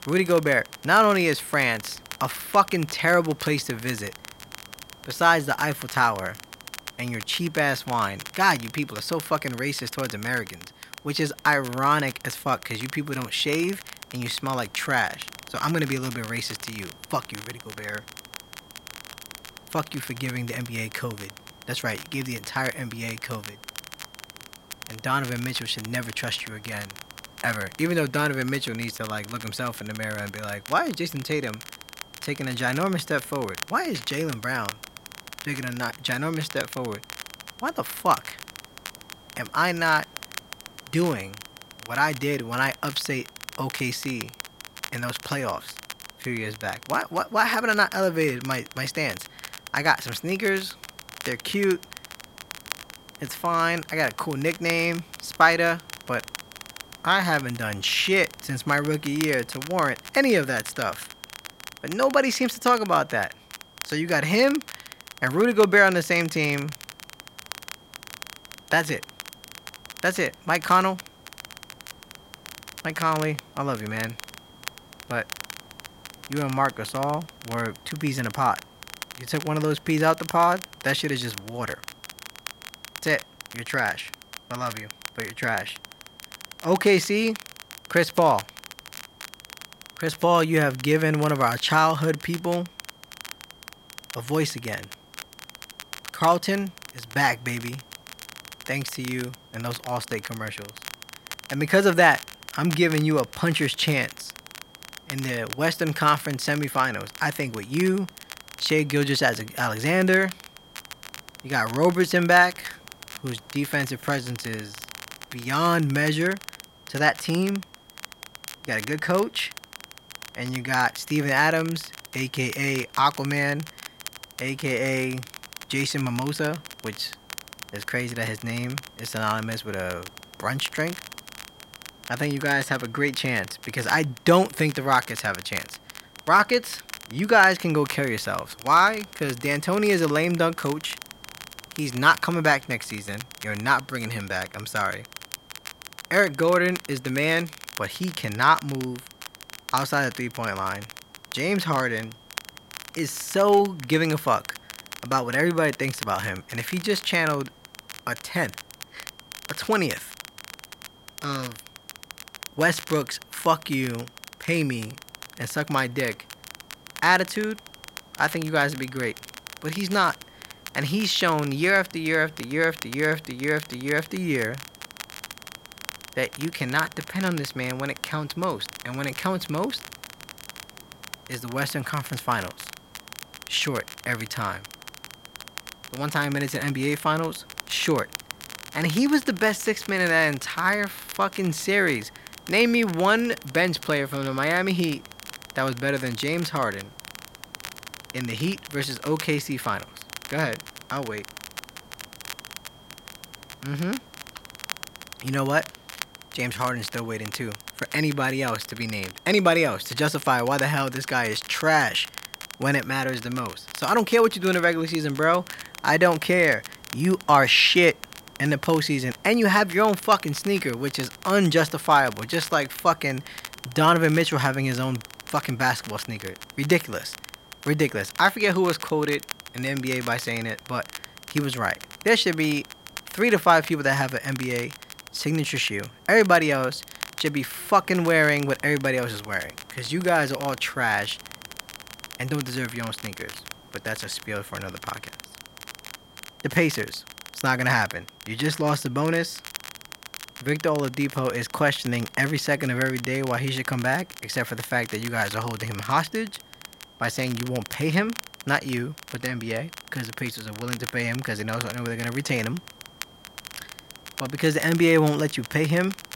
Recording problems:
crackle, like an old record; noticeable; 15 dB below the speech
high-pitched whine; faint; throughout; 3 kHz, 30 dB below the speech
hiss; faint; throughout; 30 dB below the speech

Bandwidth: 16 kHz